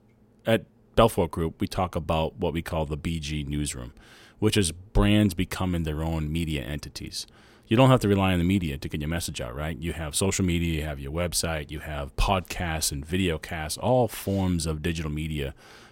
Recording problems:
none

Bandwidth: 16 kHz